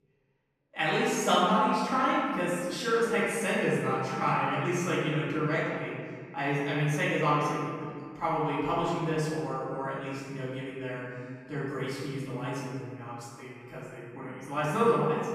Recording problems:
room echo; strong; dies away in 2.1 s
off-mic speech; far

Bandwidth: 15 kHz